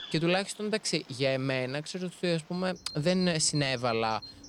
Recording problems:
animal sounds; noticeable; throughout; 15 dB below the speech

